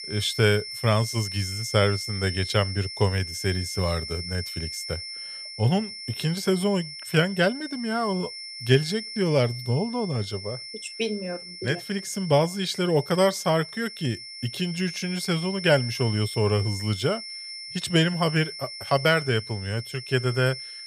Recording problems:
high-pitched whine; loud; throughout; 5.5 kHz, 9 dB below the speech

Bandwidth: 15 kHz